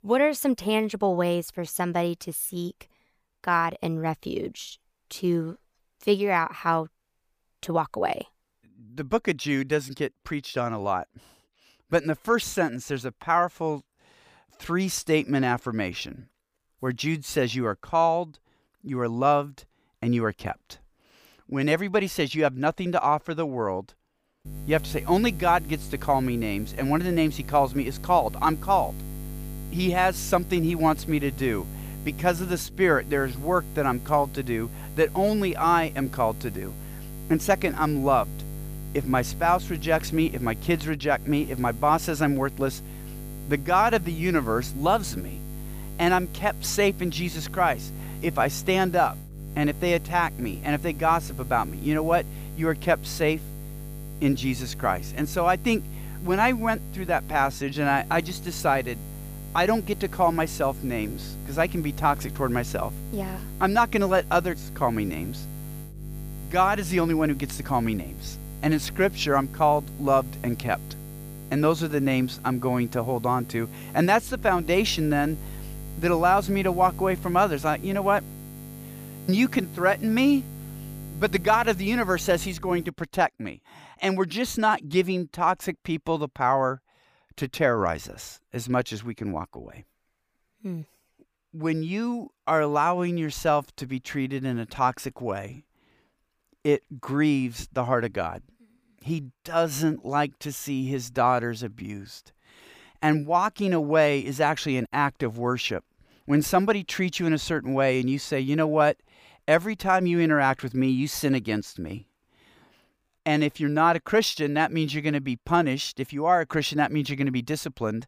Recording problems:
electrical hum; faint; from 24 s to 1:23; 50 Hz, 20 dB below the speech

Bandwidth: 15 kHz